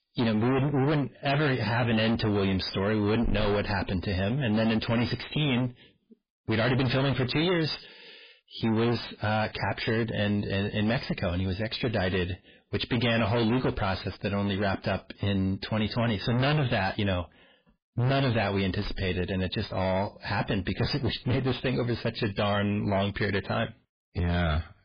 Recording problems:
distortion; heavy; 25% of the sound clipped
garbled, watery; badly; nothing above 5 kHz

